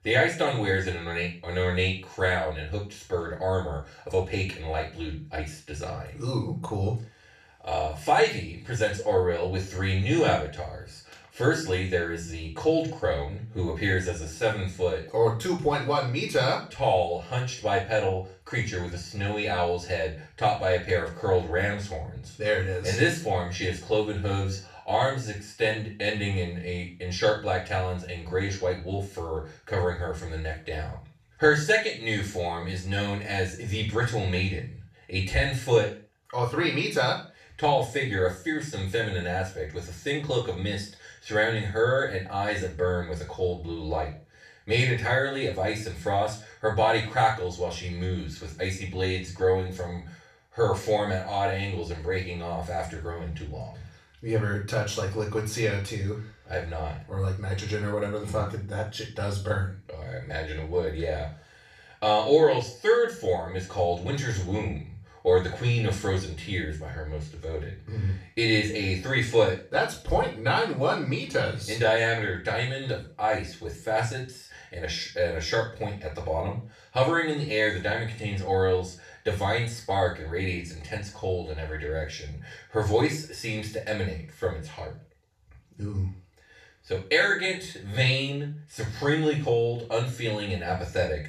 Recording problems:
off-mic speech; far
room echo; noticeable; dies away in 0.3 s

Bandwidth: 14 kHz